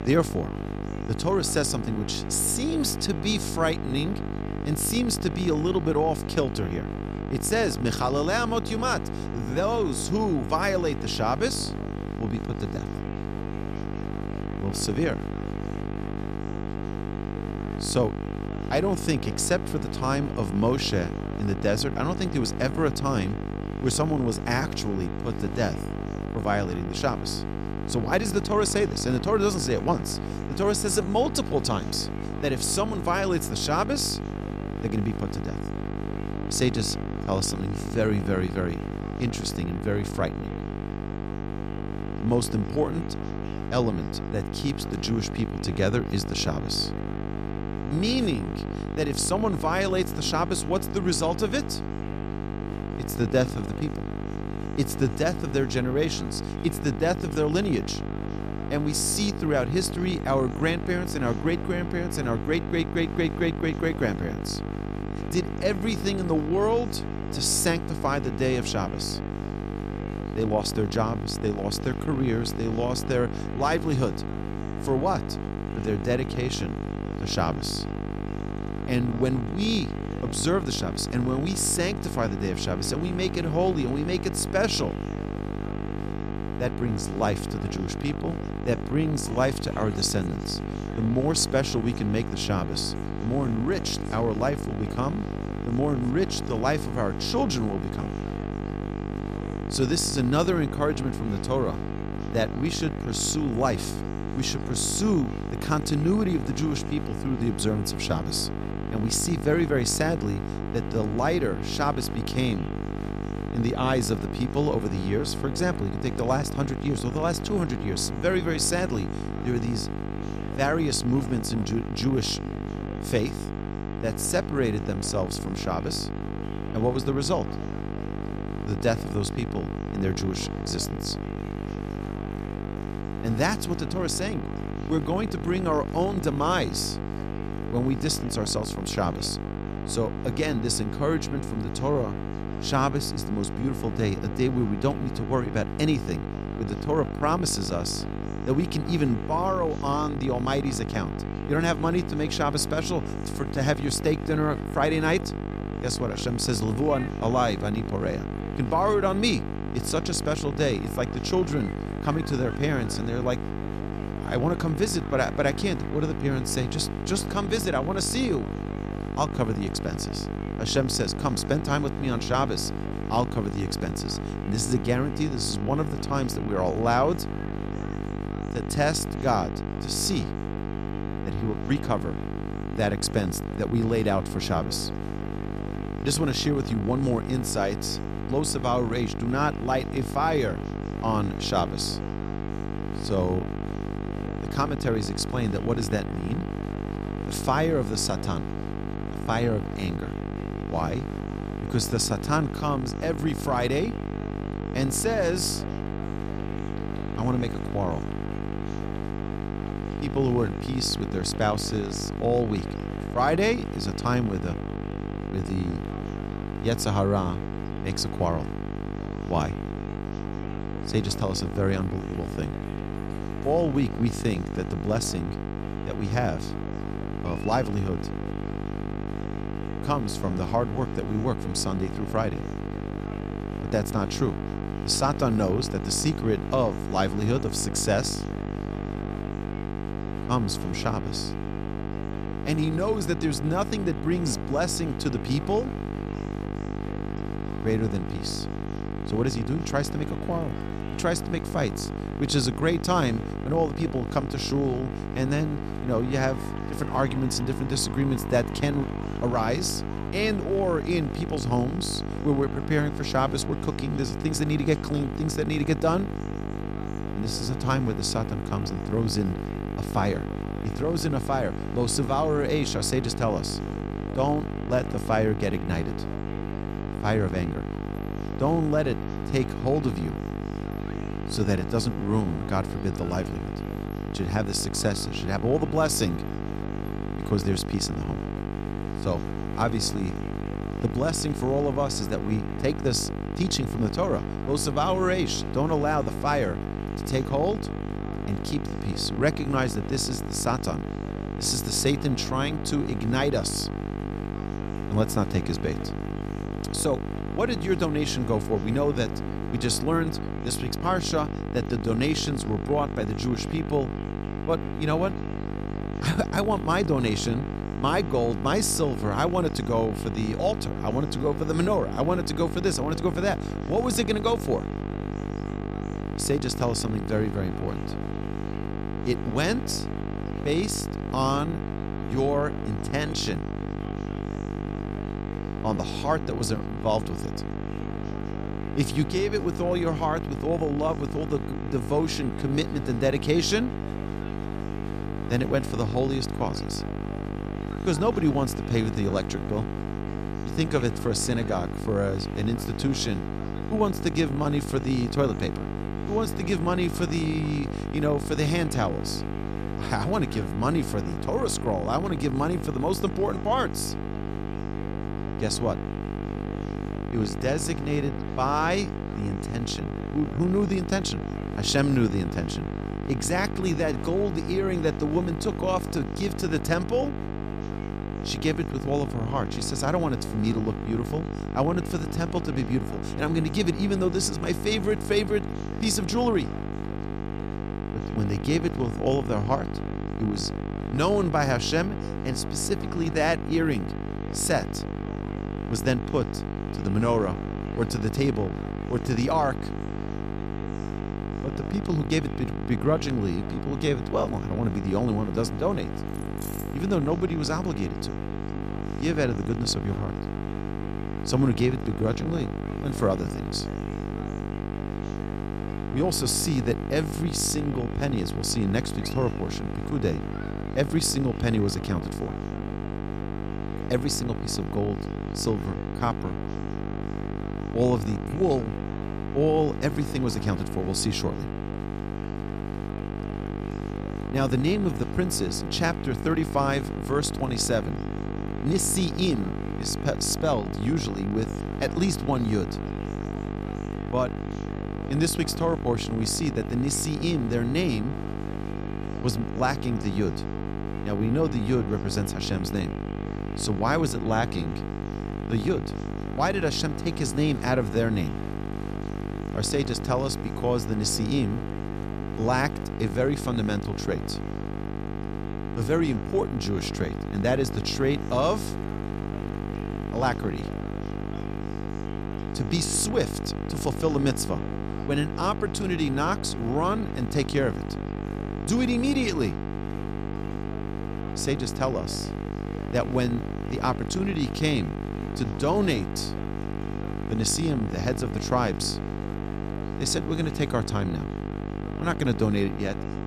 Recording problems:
electrical hum; loud; throughout; 50 Hz, 8 dB below the speech
chatter from many people; faint; throughout; 20 dB below the speech
jangling keys; faint; at 6:46; peak 10 dB below the speech

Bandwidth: 14 kHz